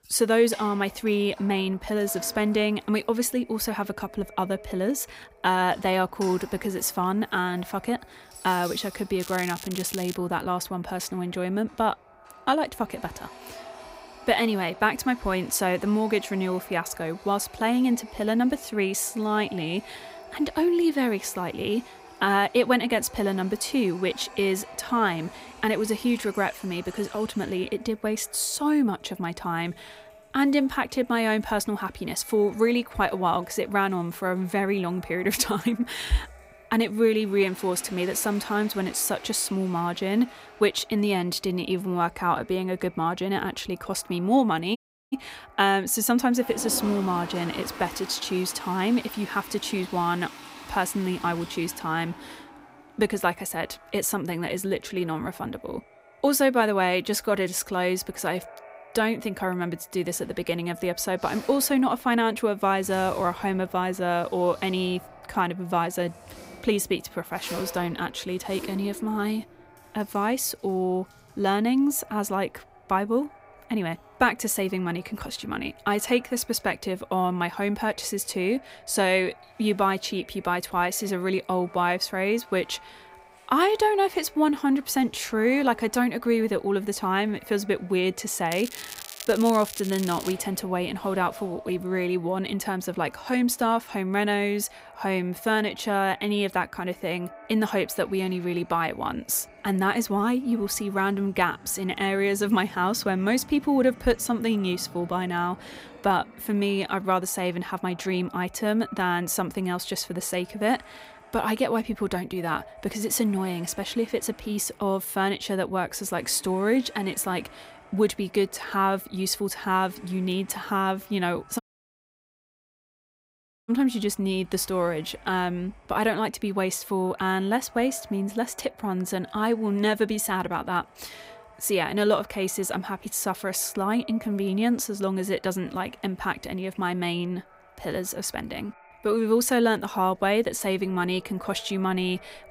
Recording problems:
echo of what is said; faint; throughout; 550 ms later, 25 dB below the speech
household noises; noticeable; throughout; 20 dB below the speech
crackling; noticeable; at 9 s and from 1:29 to 1:30; 10 dB below the speech
audio cutting out; at 45 s and at 2:02 for 2 s

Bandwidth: 15.5 kHz